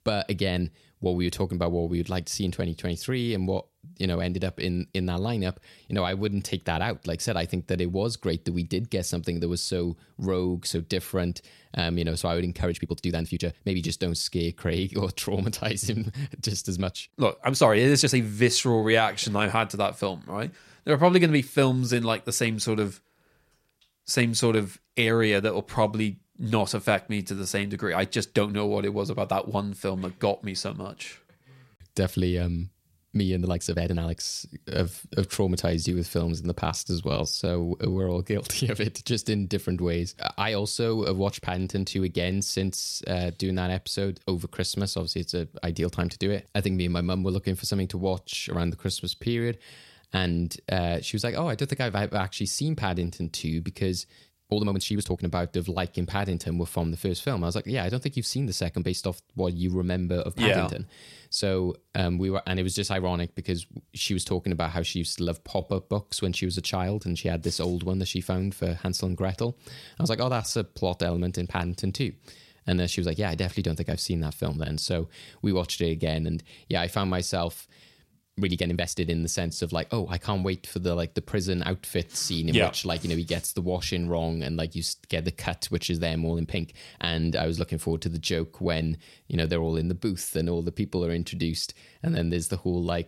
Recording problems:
uneven, jittery; strongly; from 5.5 s to 1:27

